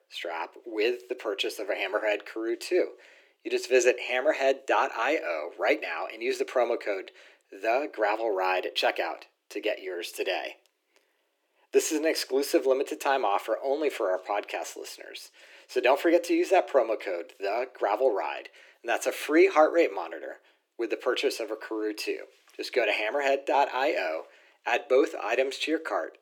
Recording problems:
thin; very; fading below 300 Hz

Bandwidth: 18.5 kHz